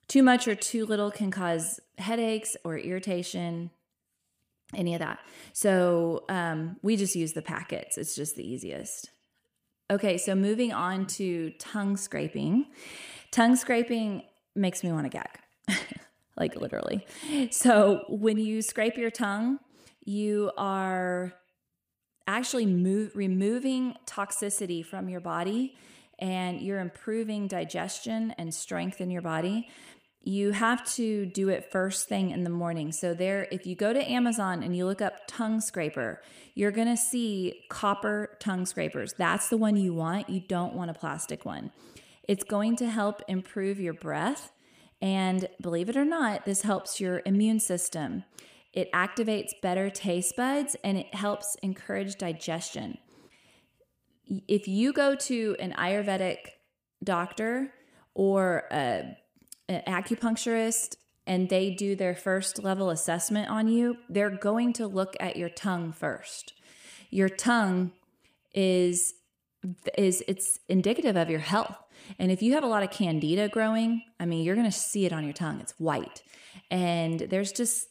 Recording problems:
echo of what is said; faint; throughout; 90 ms later, 20 dB below the speech

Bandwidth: 15 kHz